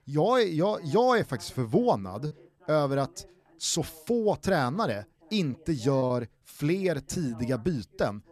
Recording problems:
voice in the background; faint; throughout; 25 dB below the speech
choppy; occasionally; at 2.5 s and at 6 s; 4% of the speech affected

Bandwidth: 14.5 kHz